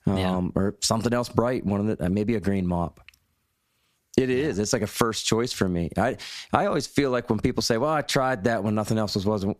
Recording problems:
squashed, flat; somewhat

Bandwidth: 14.5 kHz